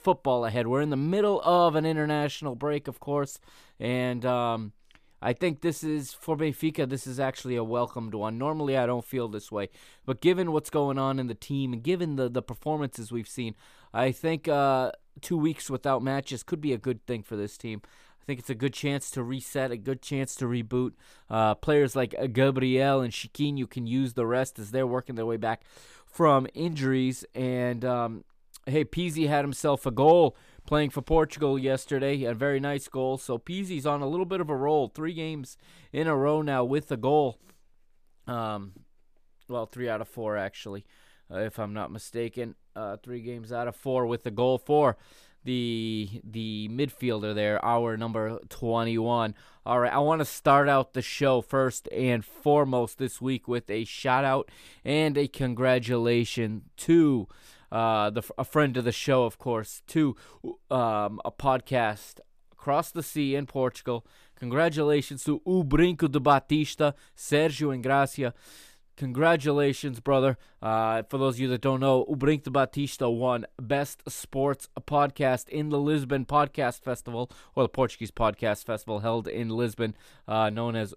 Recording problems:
none

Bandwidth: 14.5 kHz